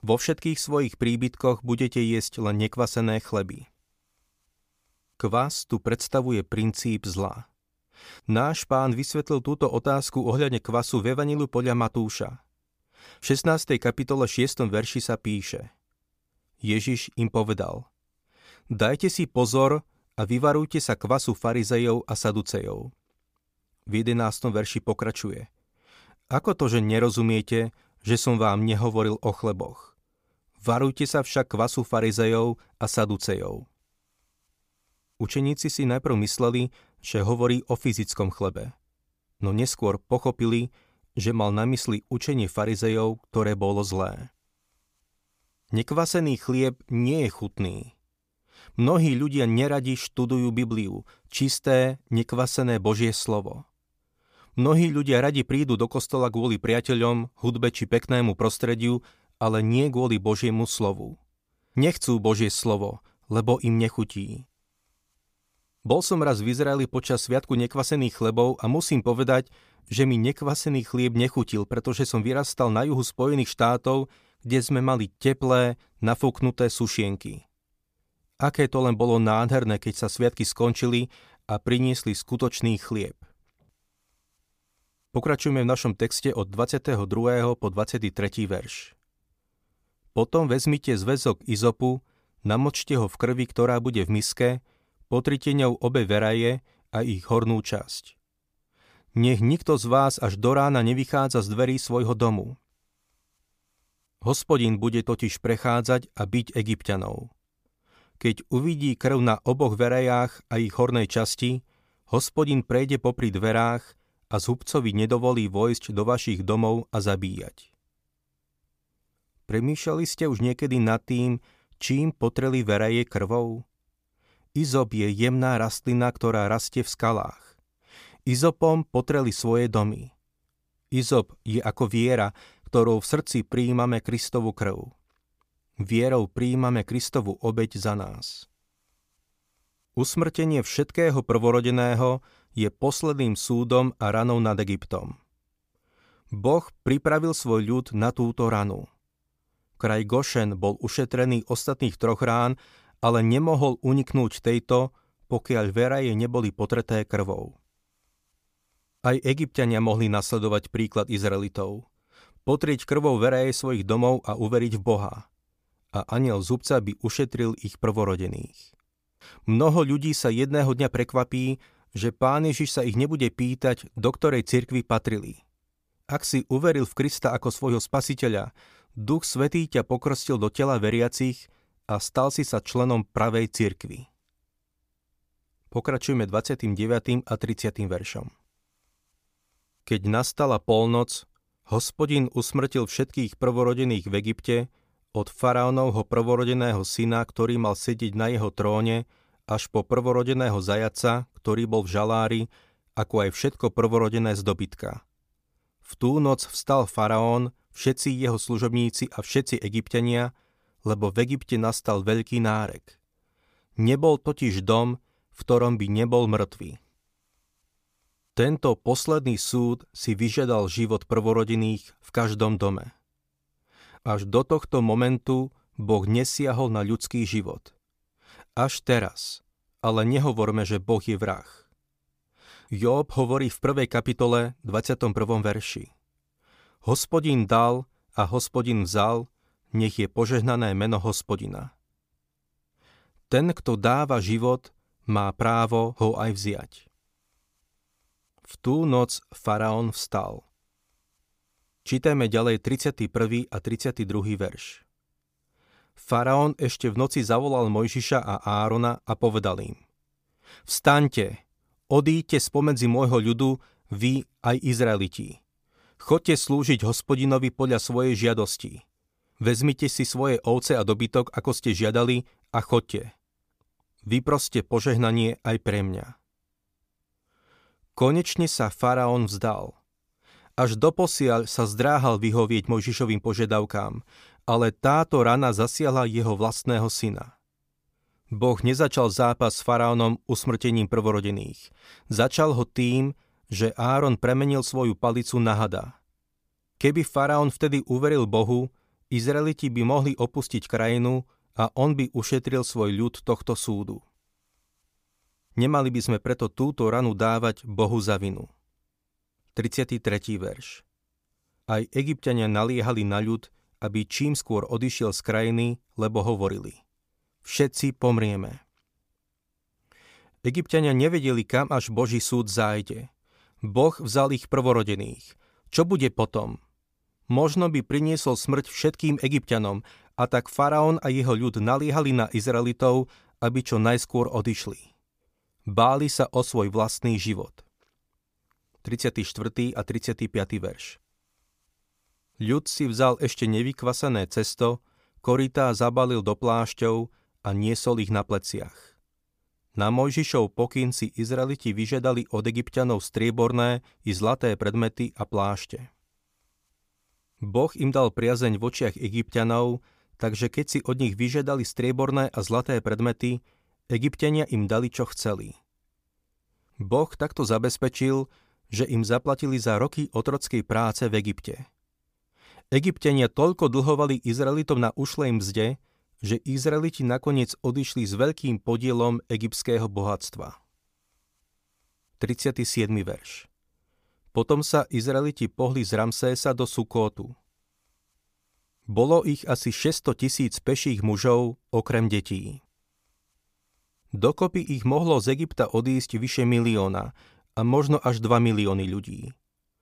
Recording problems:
none

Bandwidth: 15 kHz